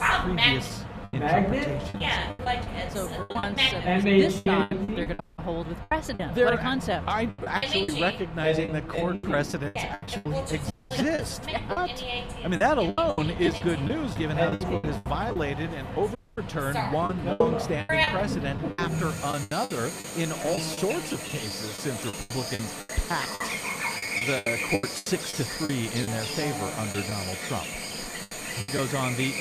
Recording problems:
animal sounds; very loud; throughout; 1 dB above the speech
choppy; very; 13% of the speech affected
audio cutting out; at 5 s, at 11 s and at 16 s

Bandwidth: 14.5 kHz